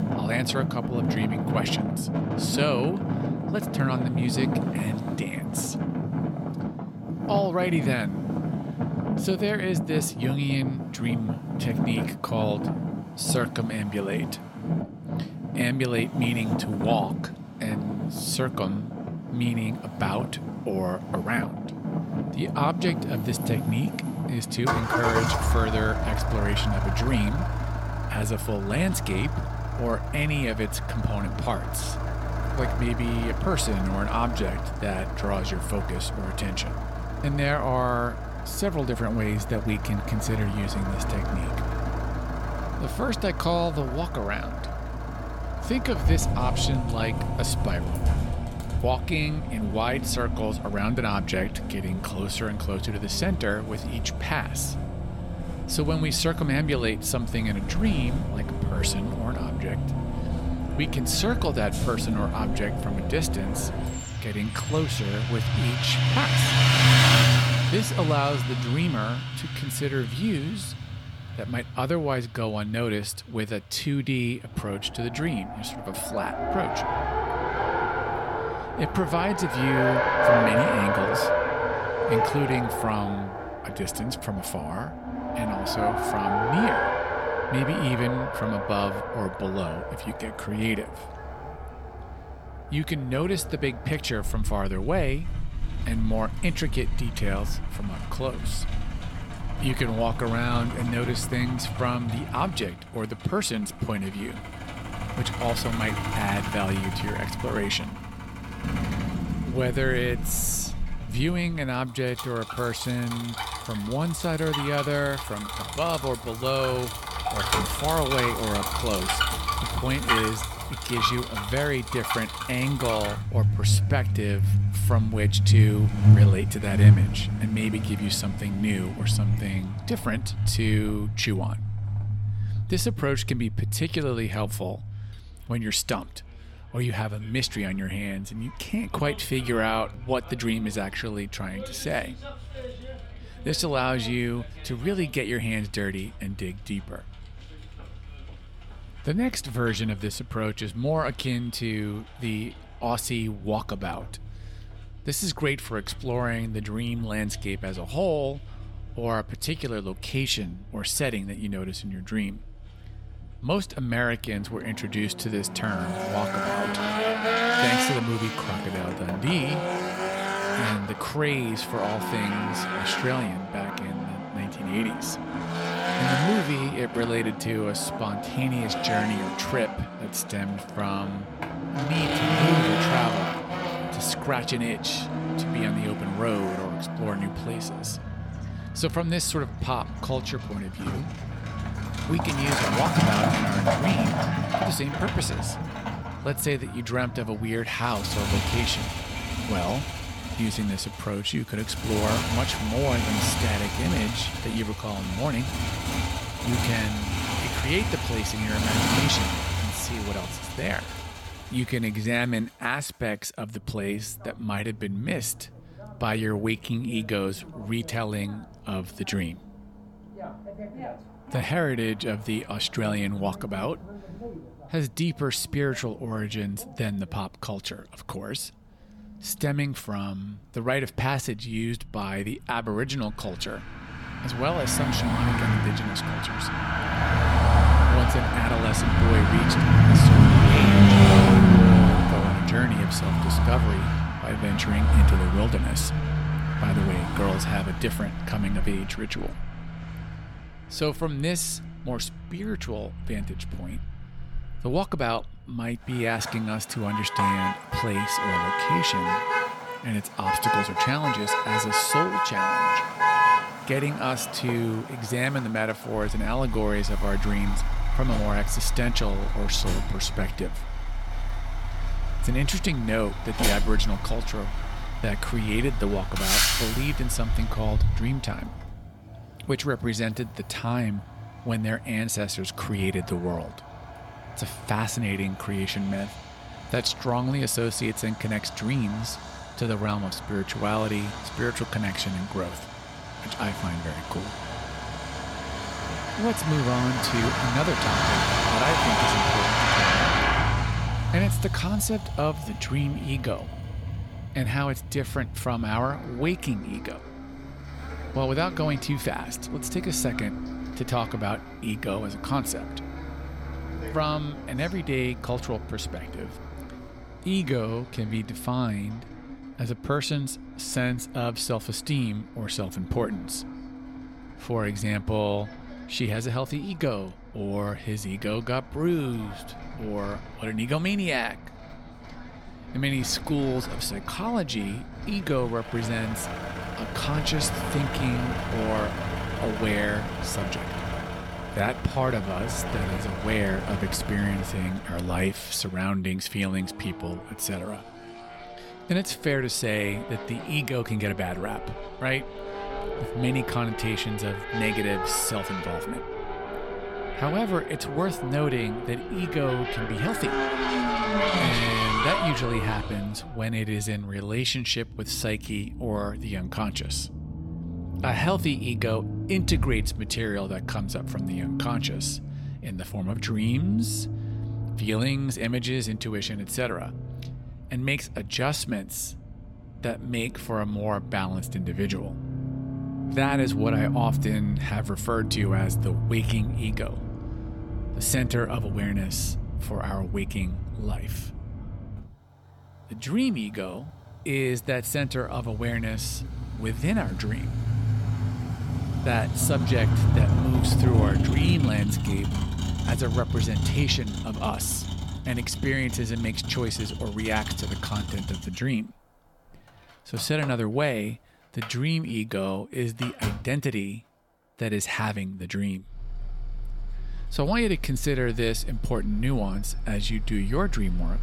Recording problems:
traffic noise; very loud; throughout; 1 dB above the speech

